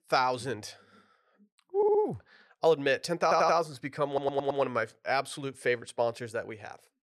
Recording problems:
audio stuttering; at 2 s, at 3 s and at 4 s

